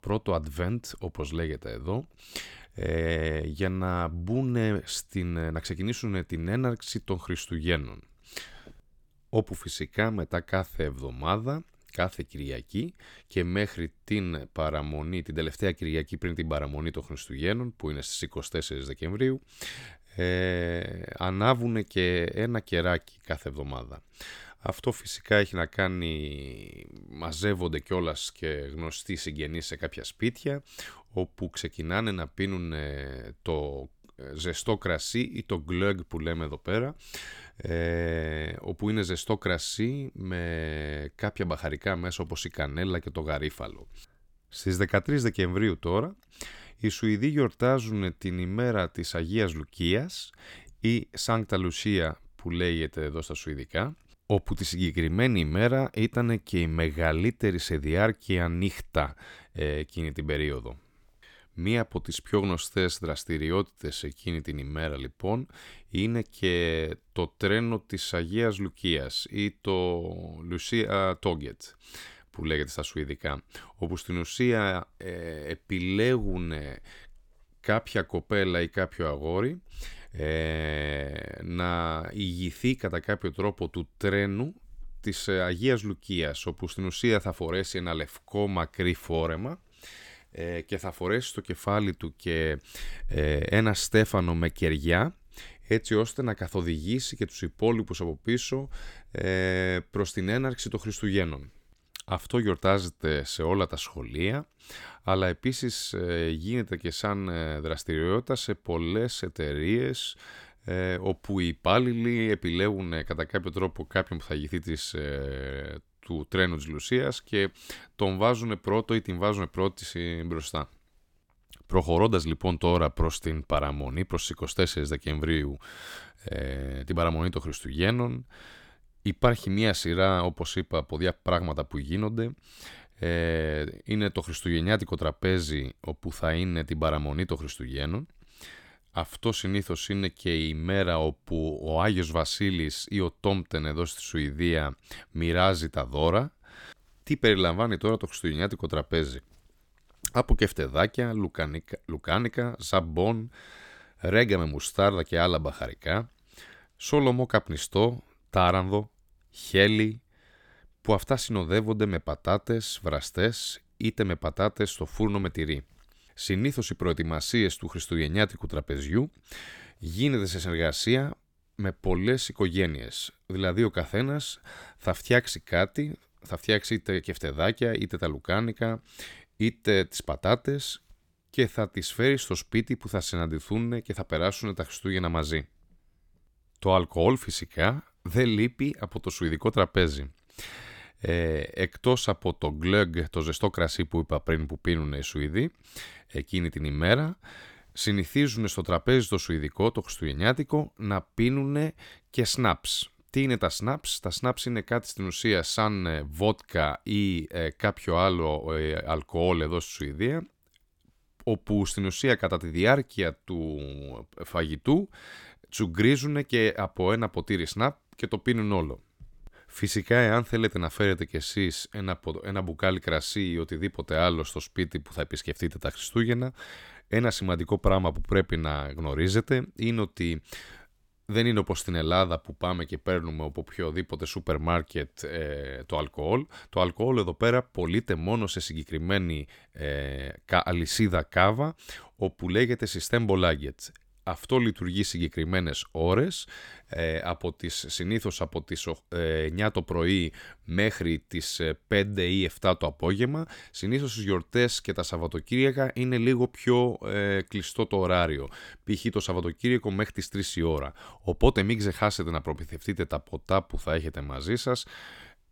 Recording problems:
none

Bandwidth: 18.5 kHz